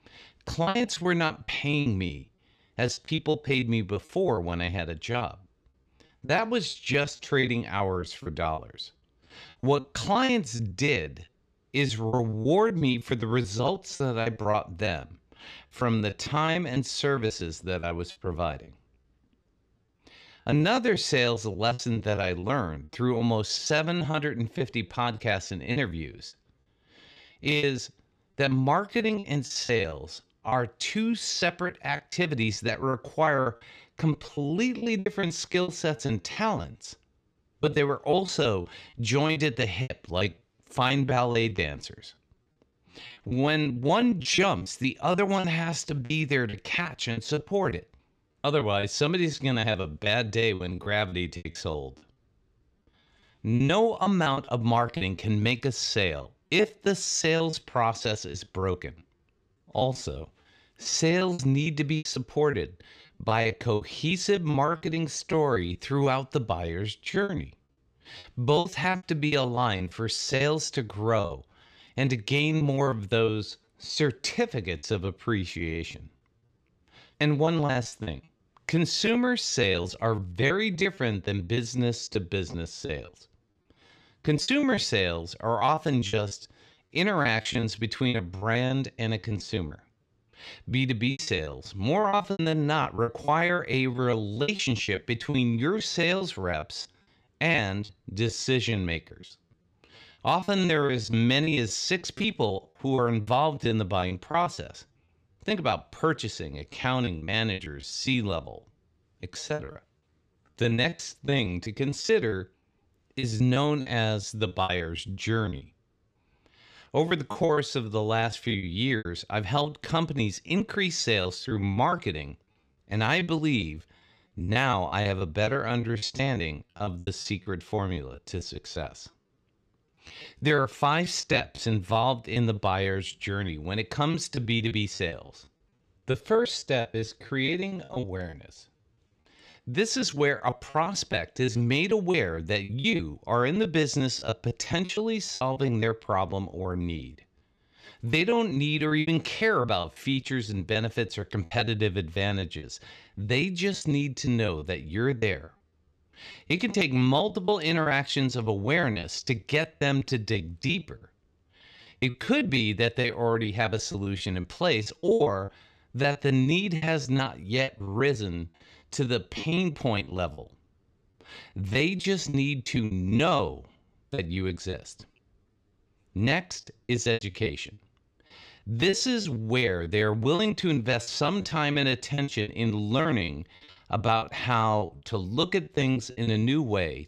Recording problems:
choppy; very; 17% of the speech affected

